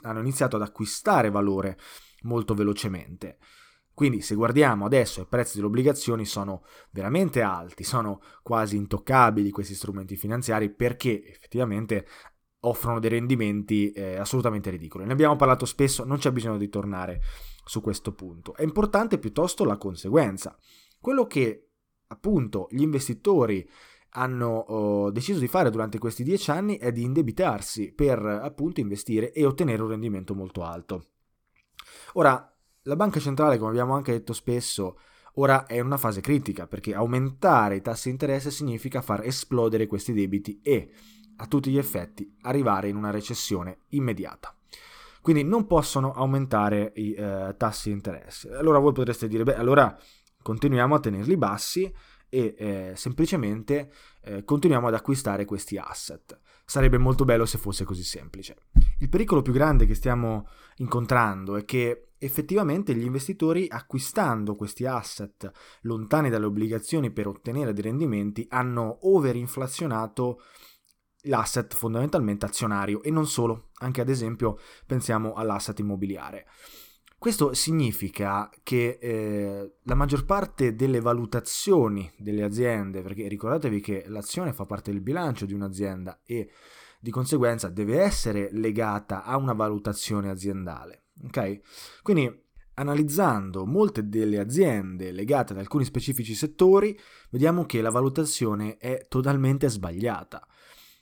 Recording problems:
none

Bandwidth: 18.5 kHz